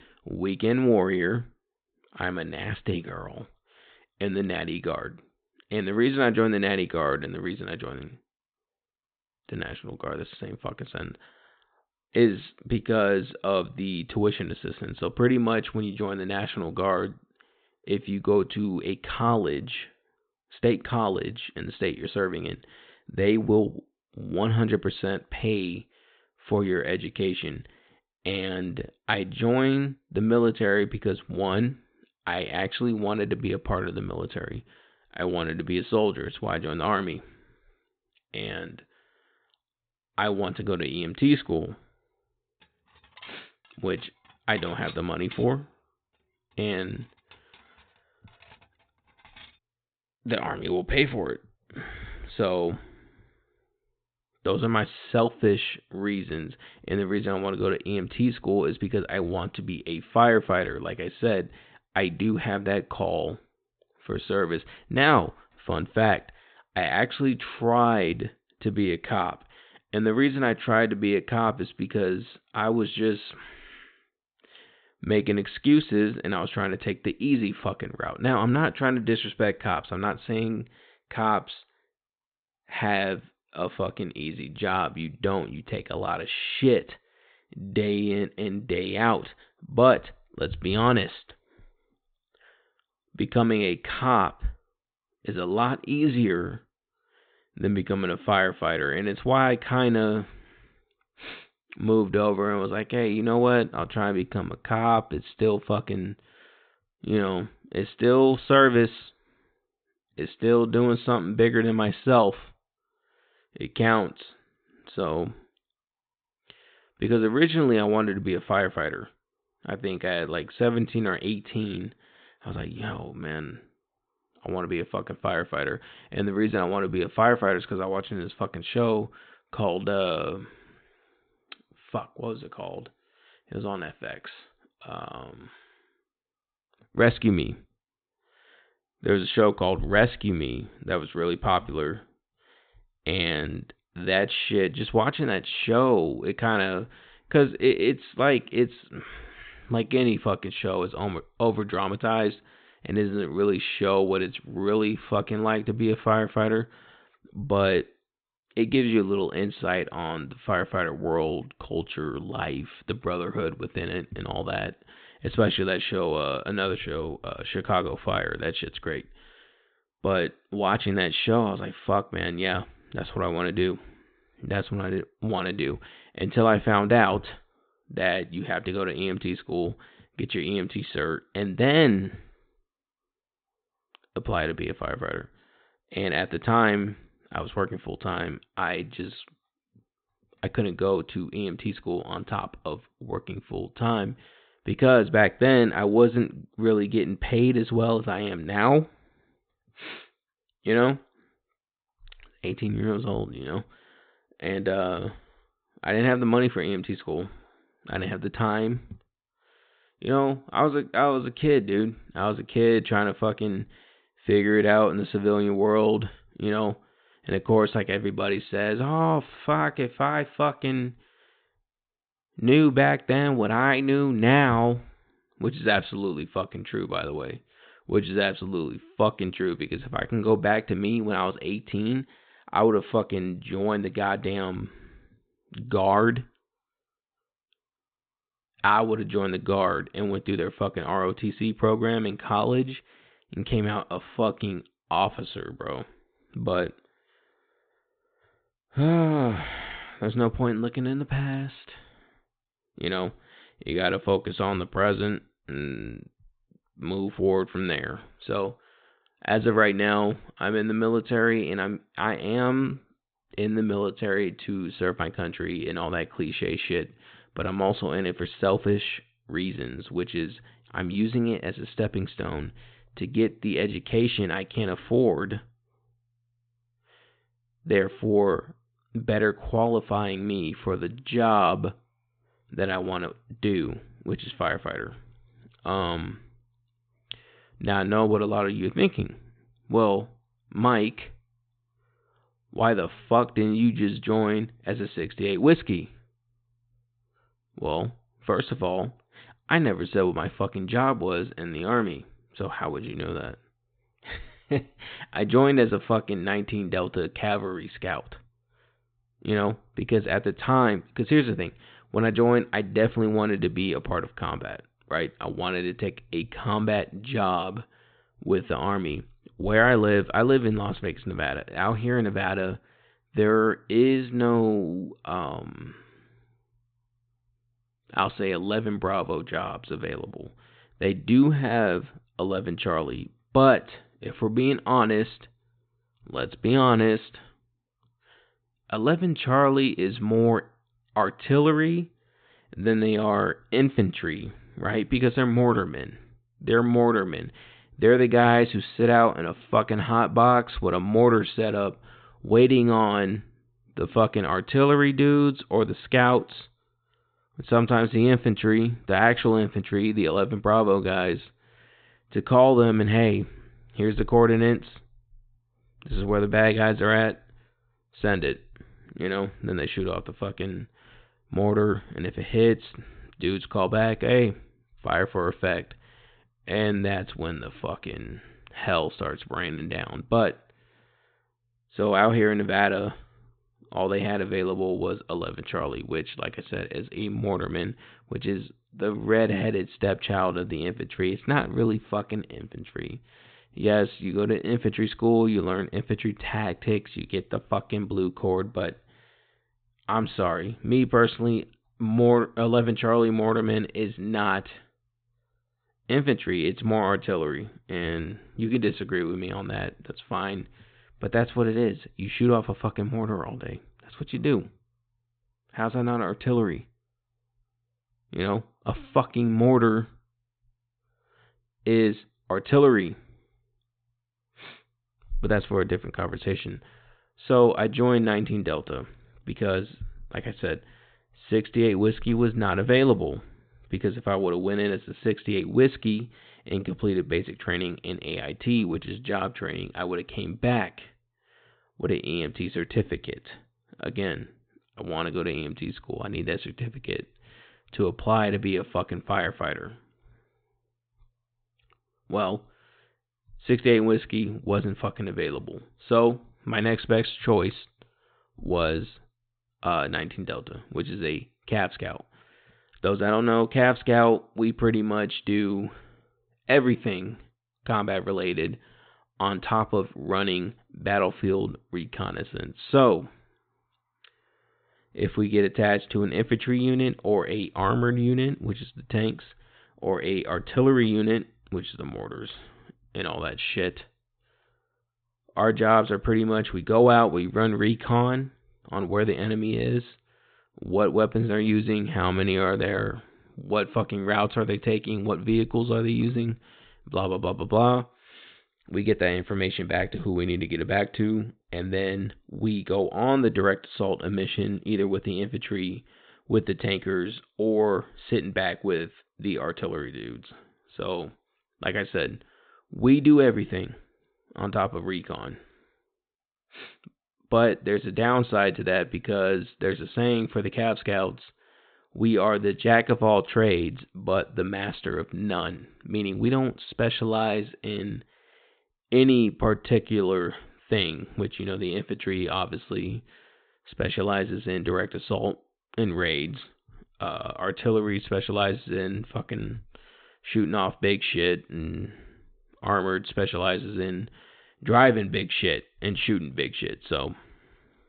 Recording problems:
high frequencies cut off; severe; nothing above 4 kHz
clattering dishes; faint; from 43 to 49 s; peak 15 dB below the speech

